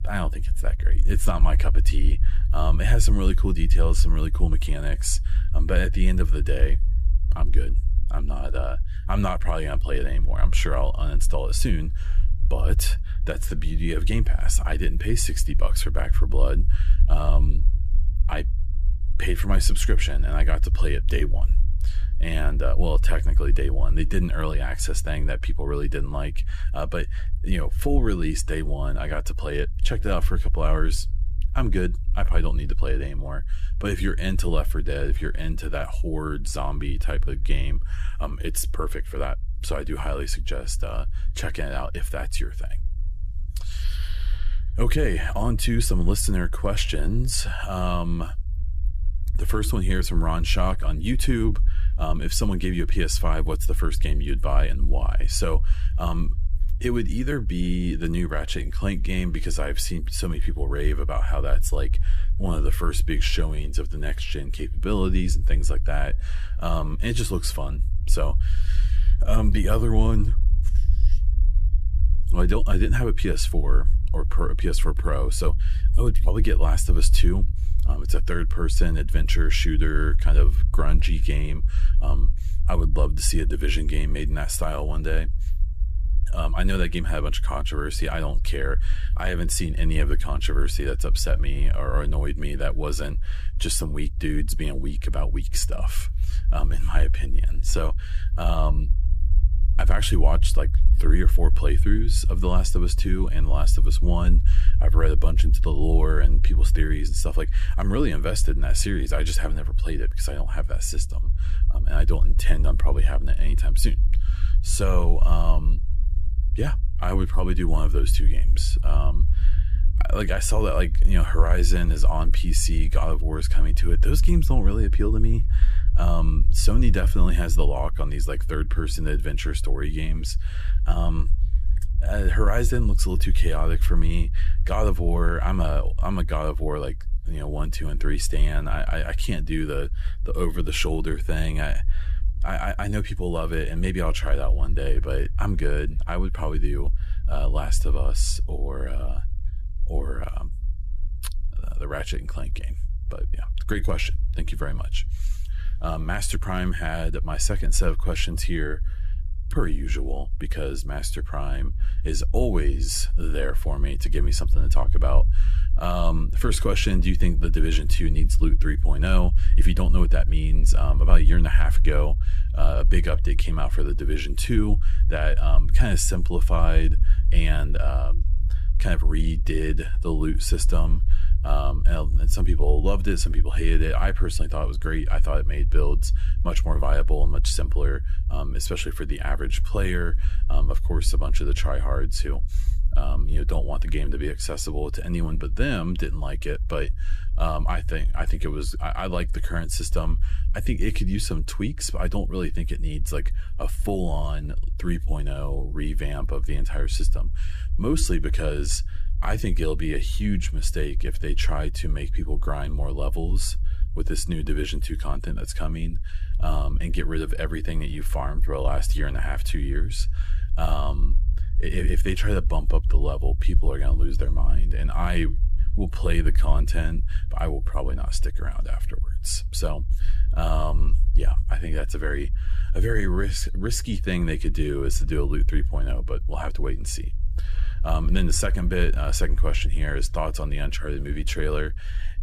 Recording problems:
low rumble; noticeable; throughout; 15 dB below the speech

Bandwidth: 14.5 kHz